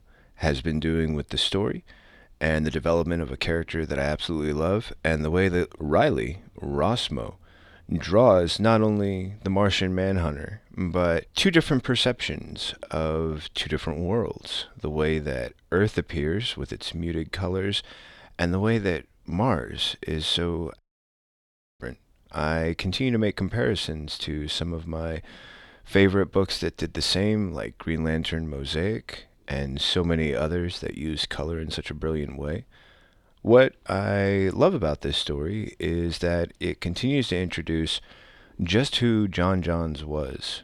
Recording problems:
audio cutting out; at 21 s for 1 s

